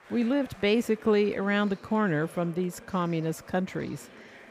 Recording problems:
chatter from many people; faint; throughout; 20 dB below the speech

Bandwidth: 15 kHz